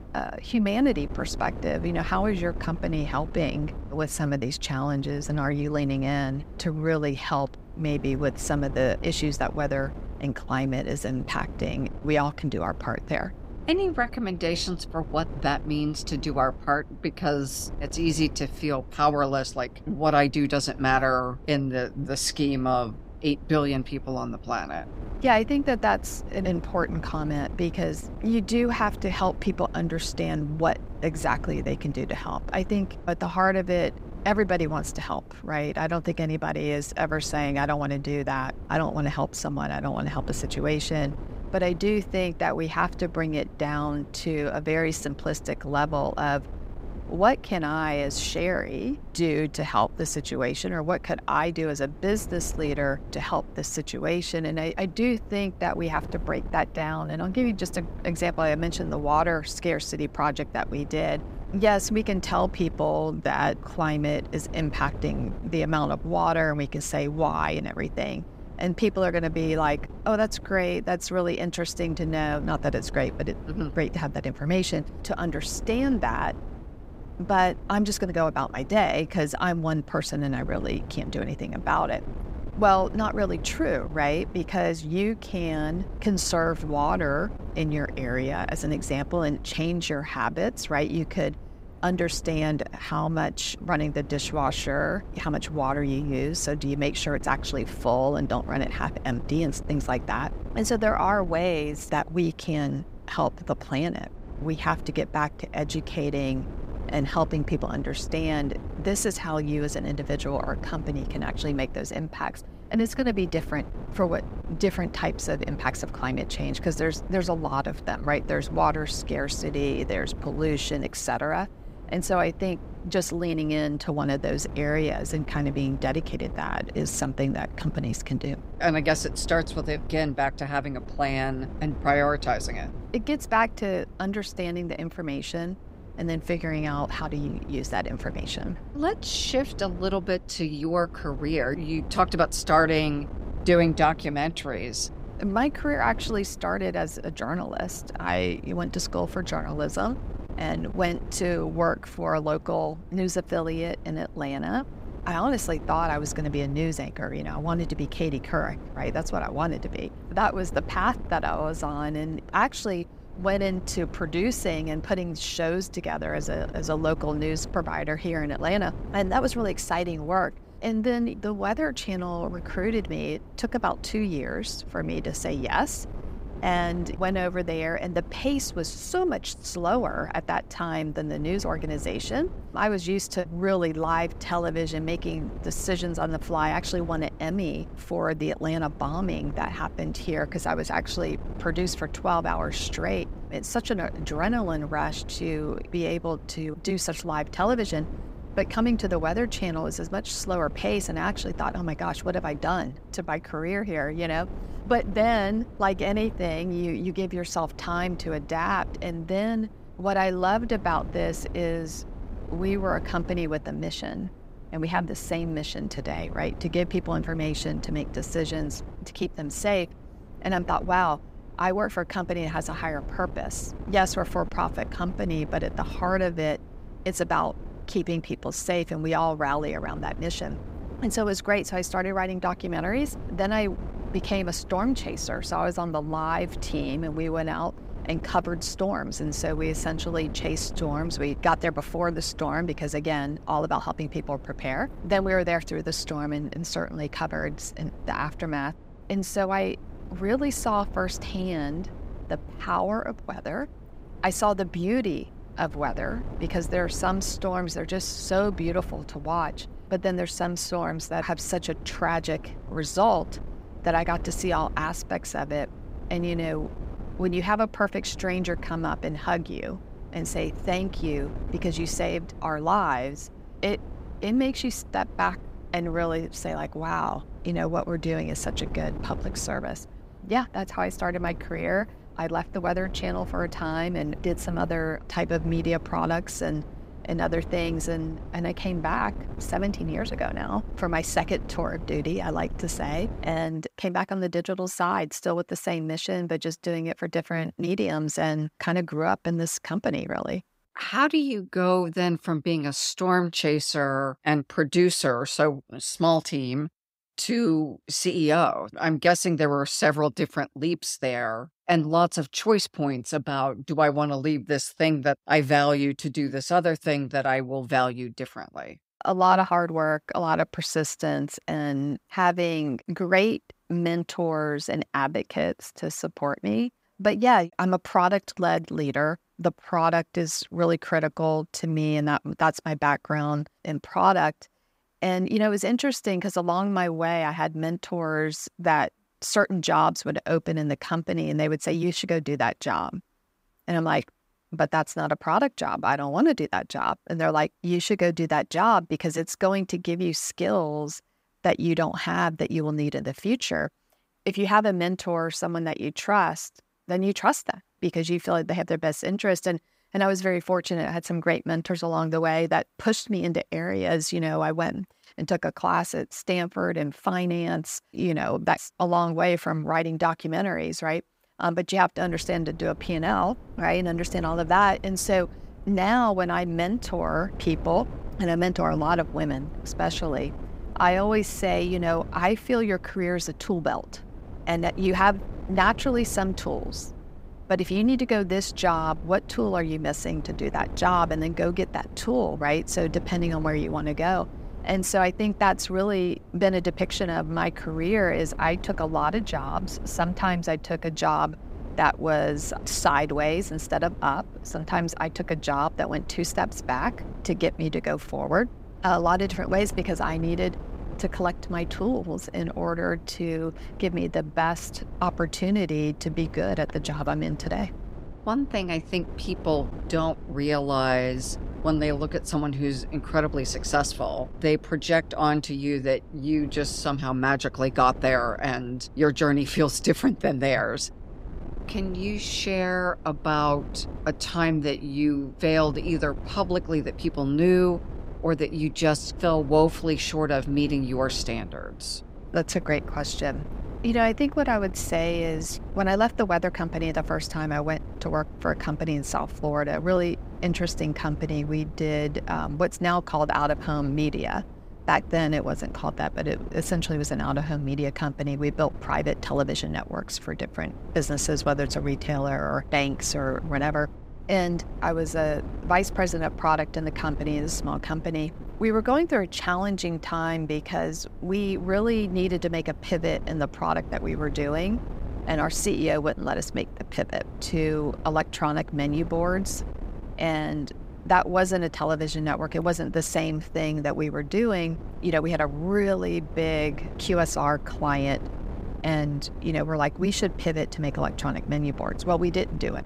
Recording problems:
wind noise on the microphone; occasional gusts; until 4:53 and from 6:12 on; 20 dB below the speech

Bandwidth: 15.5 kHz